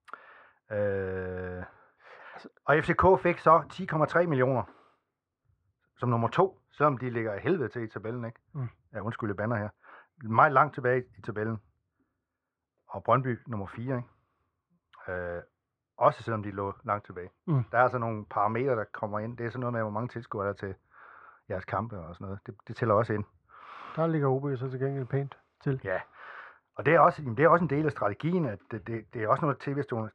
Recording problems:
muffled; very; fading above 1.5 kHz

